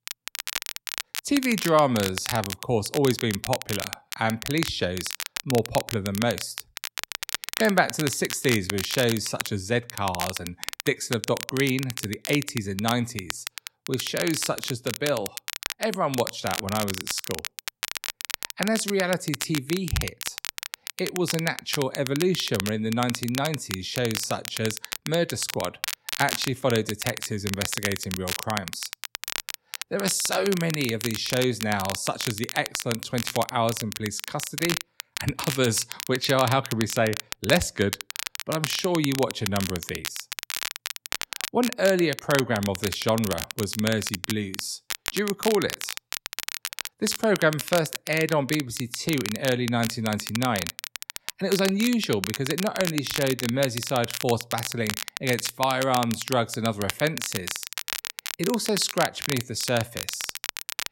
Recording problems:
crackle, like an old record; loud; 6 dB below the speech

